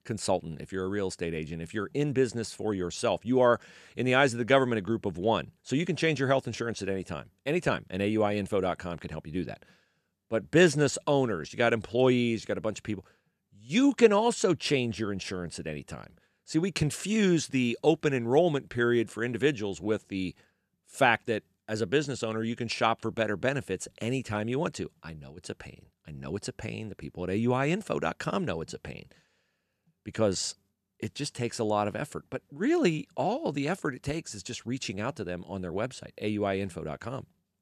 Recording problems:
none

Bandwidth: 14.5 kHz